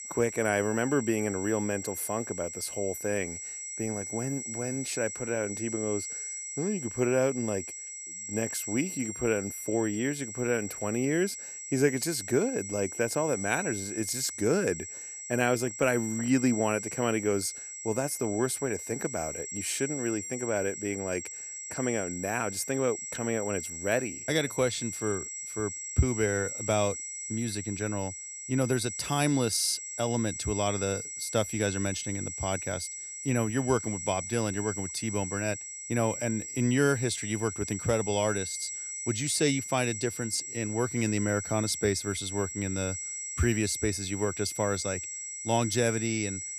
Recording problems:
high-pitched whine; loud; throughout; 7.5 kHz, 6 dB below the speech

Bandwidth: 14.5 kHz